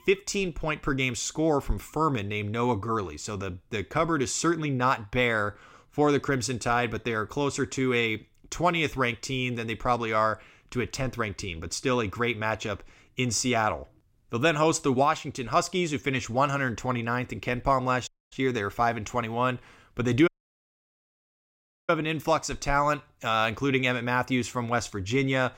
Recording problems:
audio cutting out; at 18 s and at 20 s for 1.5 s

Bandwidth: 16 kHz